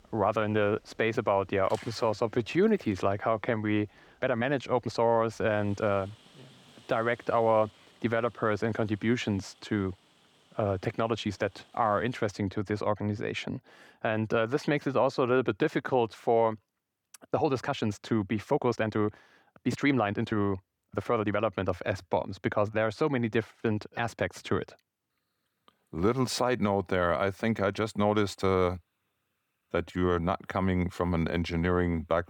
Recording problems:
rain or running water; faint; until 12 s; 30 dB below the speech
uneven, jittery; strongly; from 2 to 30 s

